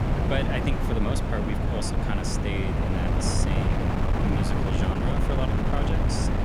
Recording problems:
wind noise on the microphone; heavy; 2 dB above the speech

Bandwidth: 19 kHz